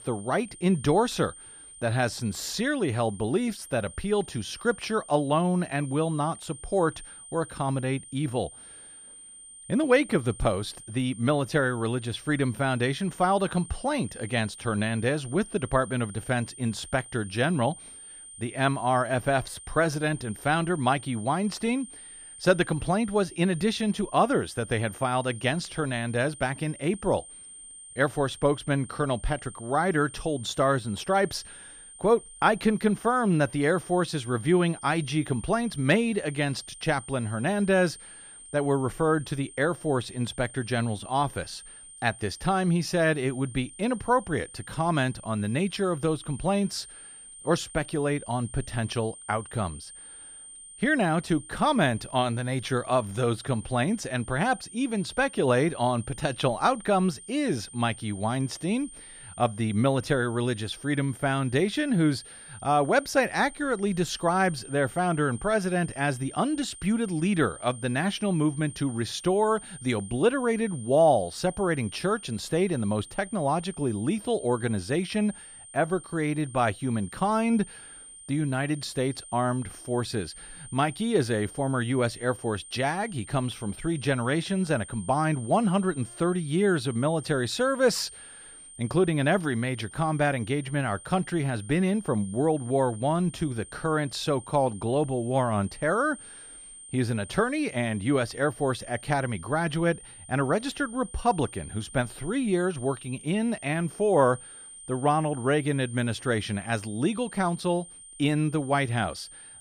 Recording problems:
high-pitched whine; noticeable; throughout; 9 kHz, 15 dB below the speech

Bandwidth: 15 kHz